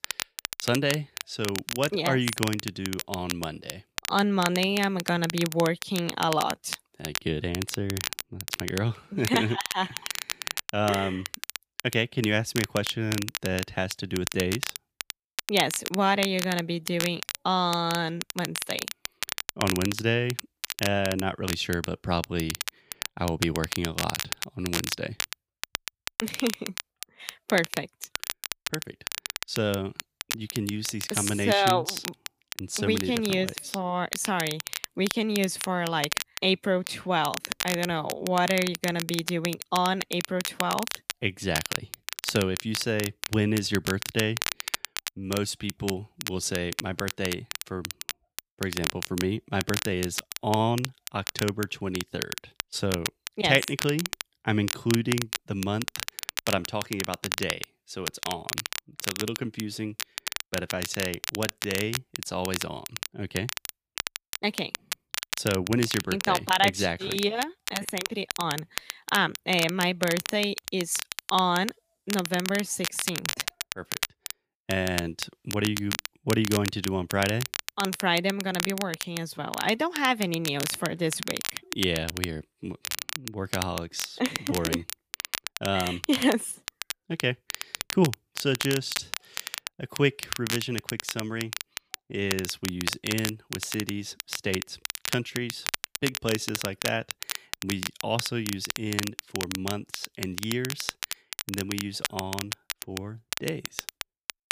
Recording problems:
crackle, like an old record; loud; 5 dB below the speech

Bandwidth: 15 kHz